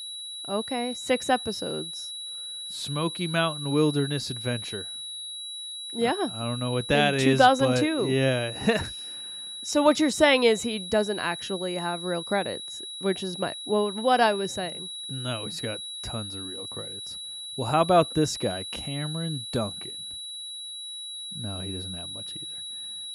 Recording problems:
high-pitched whine; loud; throughout; 4 kHz, 8 dB below the speech

